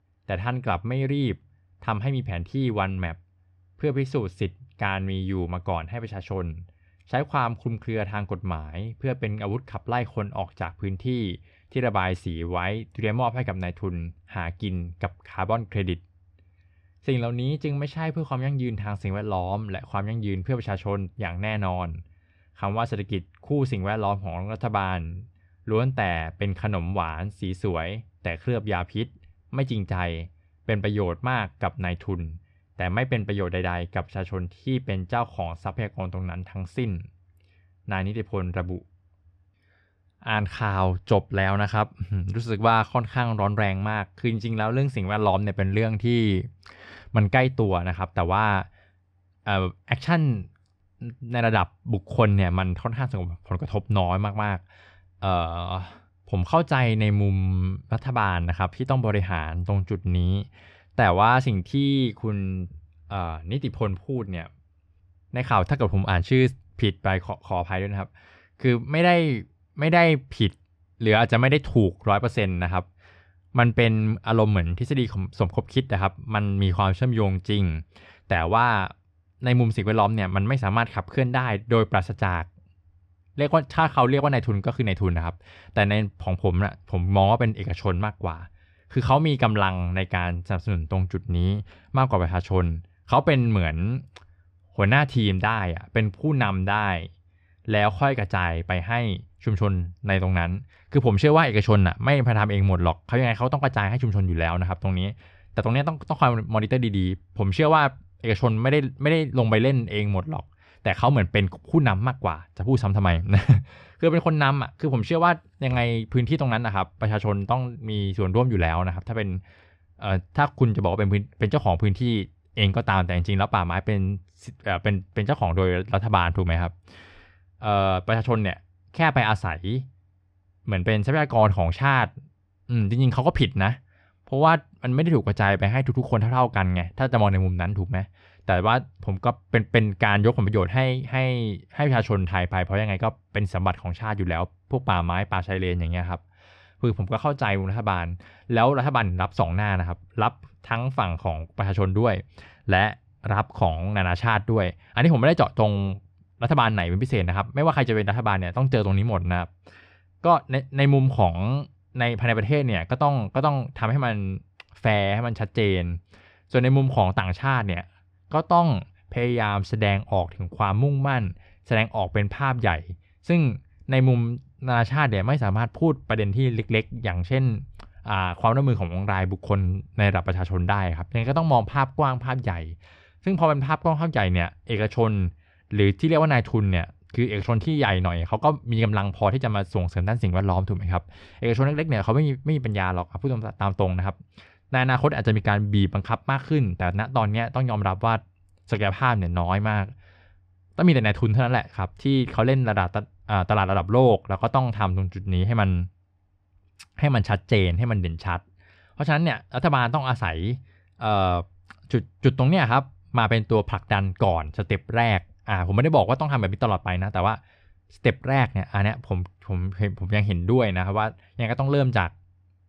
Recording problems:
muffled; very slightly; fading above 3 kHz

